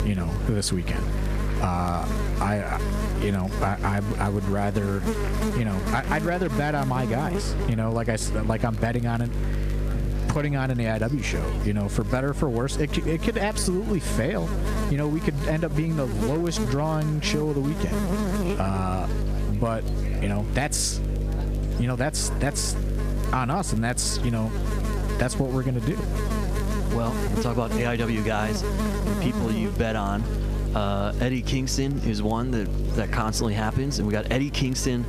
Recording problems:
squashed, flat; somewhat, background pumping
electrical hum; loud; throughout; 50 Hz, 7 dB below the speech
murmuring crowd; noticeable; throughout; 20 dB below the speech
hiss; faint; throughout; 25 dB below the speech
crackle, like an old record; faint; 30 dB below the speech

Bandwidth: 14.5 kHz